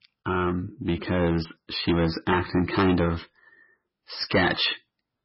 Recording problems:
distortion; heavy; 7 dB below the speech
garbled, watery; badly; nothing above 5.5 kHz

